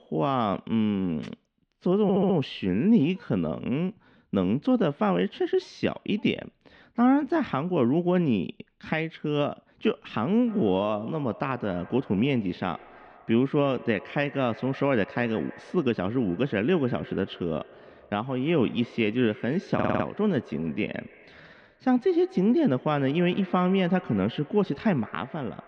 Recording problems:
muffled; slightly; fading above 3.5 kHz
echo of what is said; faint; from 10 s on; 150 ms later, 20 dB below the speech
audio stuttering; at 2 s and at 20 s

